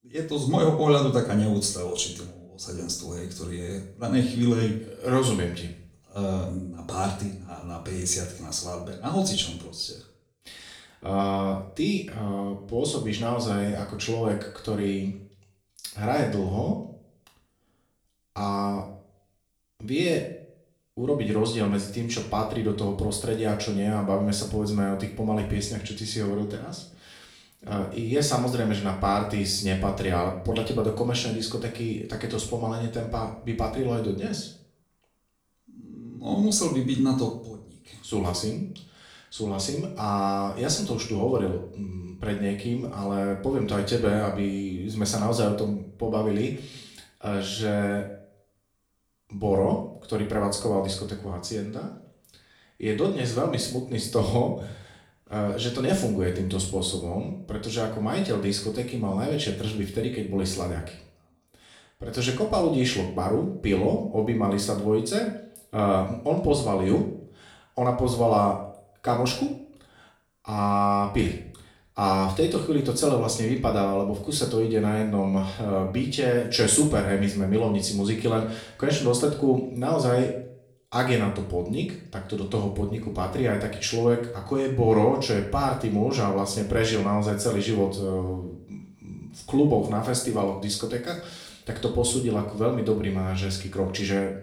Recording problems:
off-mic speech; far
room echo; slight; dies away in 0.5 s

